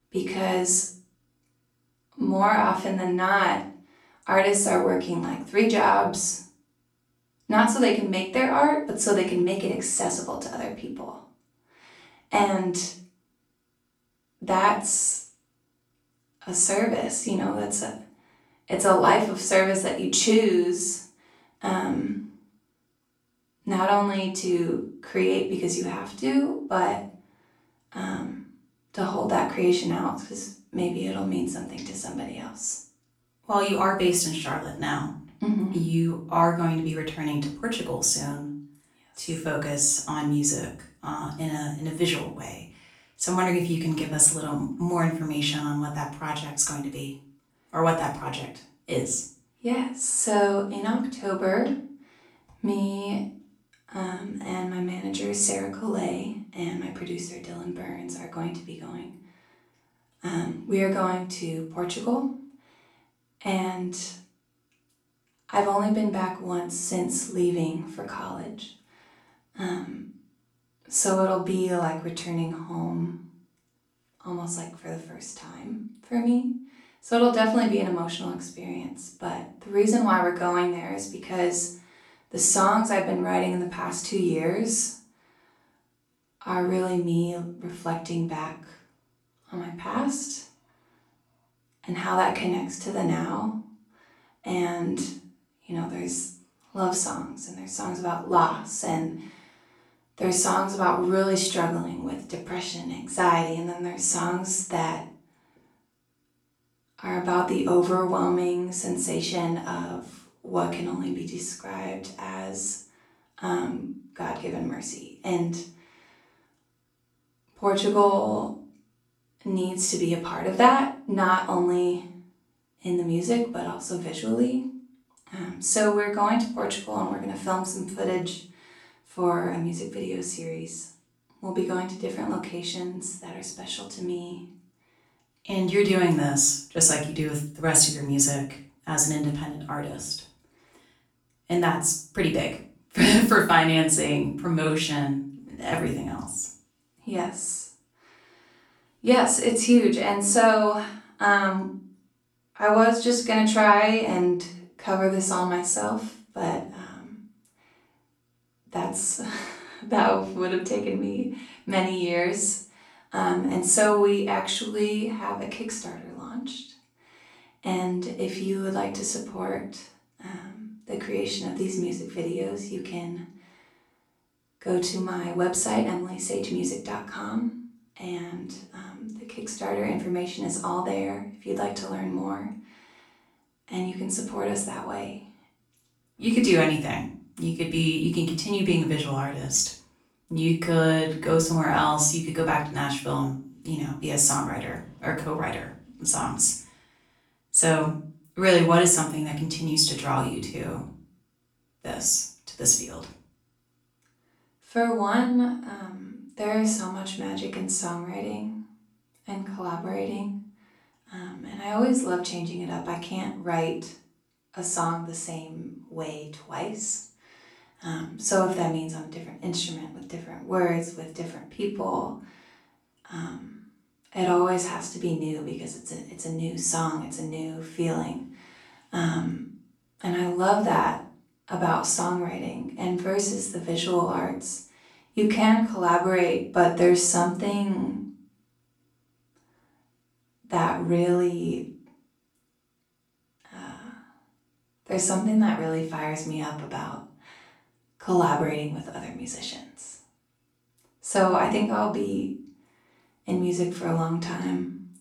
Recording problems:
off-mic speech; far
room echo; slight; dies away in 0.4 s

